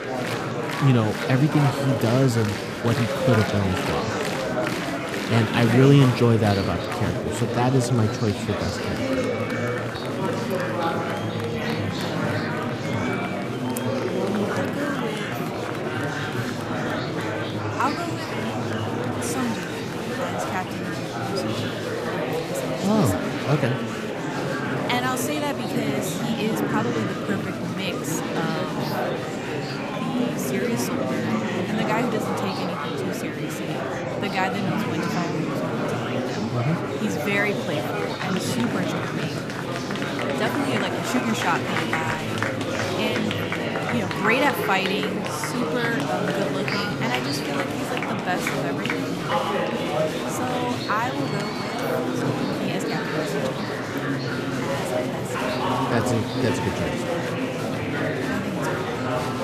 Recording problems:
murmuring crowd; very loud; throughout; 1 dB above the speech

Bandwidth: 14.5 kHz